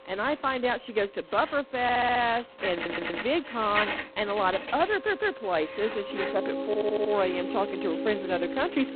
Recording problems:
phone-call audio; poor line; nothing above 4 kHz
household noises; loud; throughout; 8 dB below the speech
background music; loud; throughout; 7 dB below the speech
audio stuttering; 4 times, first at 2 s

